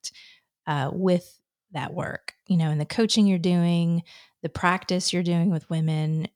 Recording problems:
none

